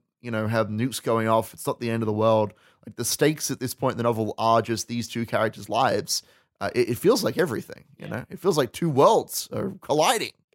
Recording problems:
none

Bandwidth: 16 kHz